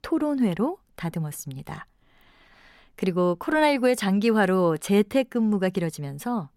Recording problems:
none

